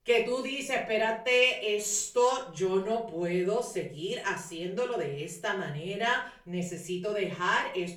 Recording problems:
off-mic speech; far
room echo; slight; dies away in 0.4 s

